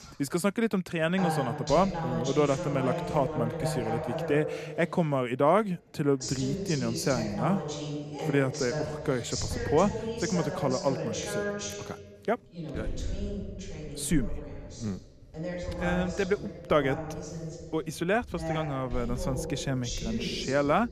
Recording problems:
voice in the background; loud; throughout; 5 dB below the speech

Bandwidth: 14 kHz